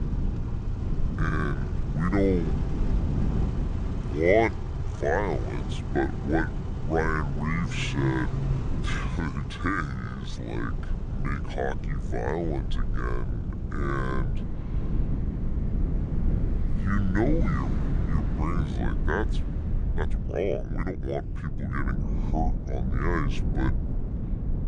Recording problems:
wrong speed and pitch; too slow and too low; 0.7 times normal speed
traffic noise; loud; throughout; 7 dB below the speech
wind noise on the microphone; occasional gusts; 10 dB below the speech
low rumble; faint; throughout; 20 dB below the speech
uneven, jittery; strongly; from 1 to 21 s

